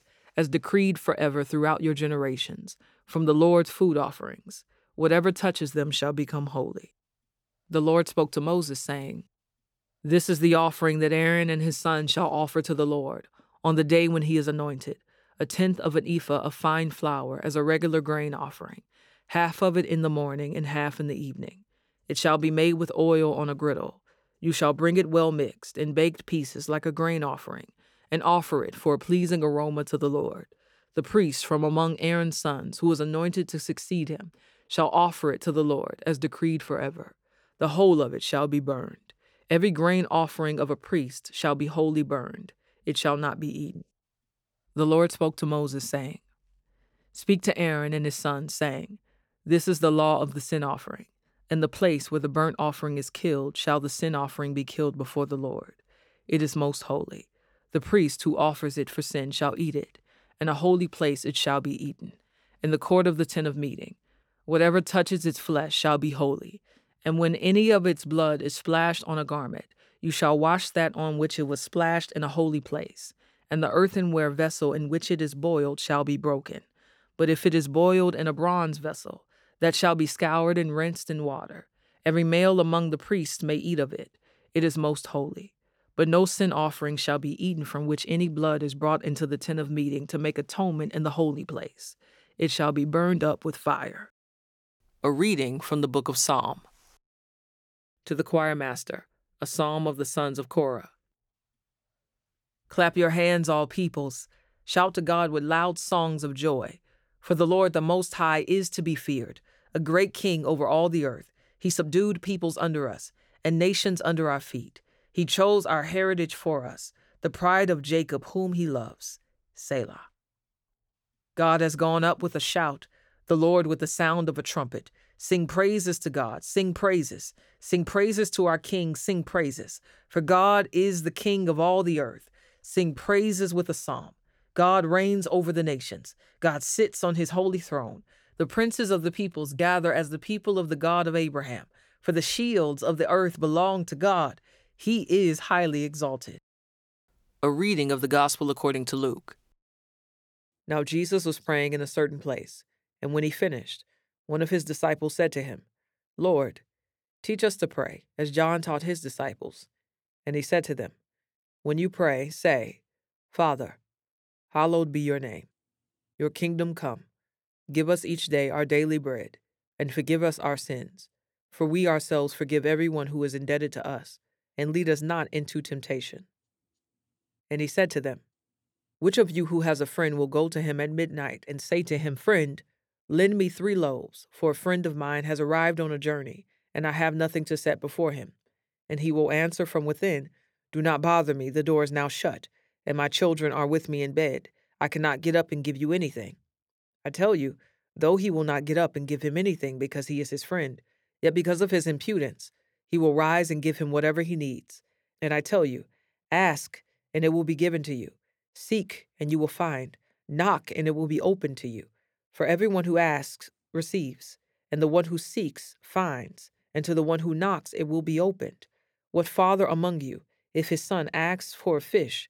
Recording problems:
uneven, jittery; strongly; from 1:07 to 2:13

